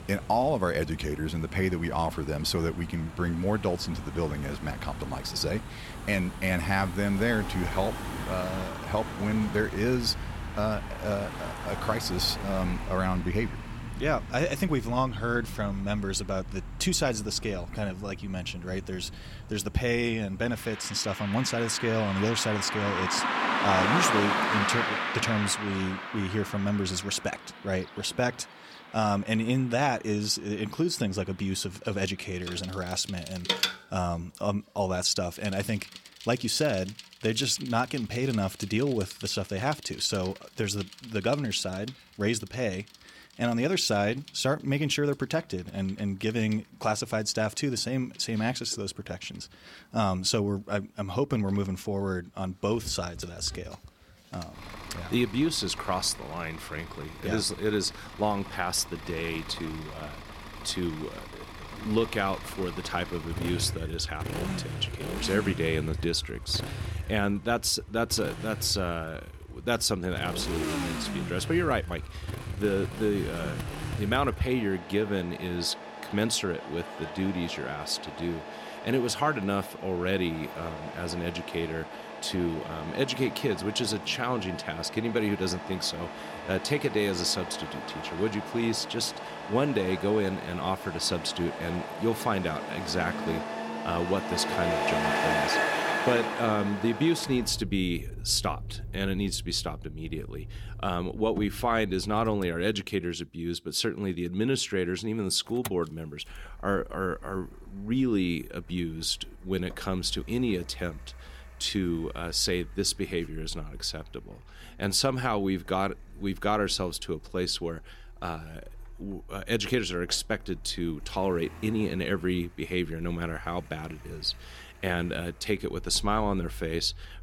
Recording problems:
traffic noise; loud; throughout; 7 dB below the speech

